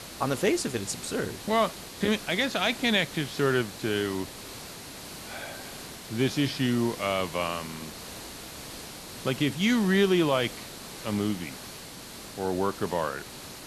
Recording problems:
hiss; noticeable; throughout; 10 dB below the speech

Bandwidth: 13 kHz